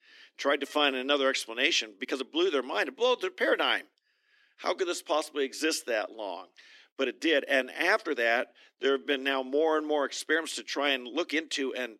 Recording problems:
thin; very slightly; fading below 250 Hz
uneven, jittery; strongly; from 1 to 11 s

